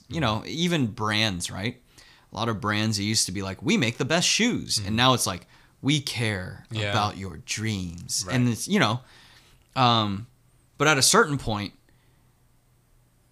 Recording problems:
none

